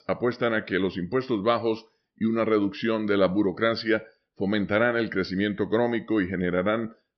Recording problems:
high frequencies cut off; noticeable; nothing above 5.5 kHz

